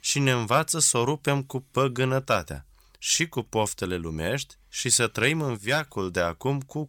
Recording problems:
none

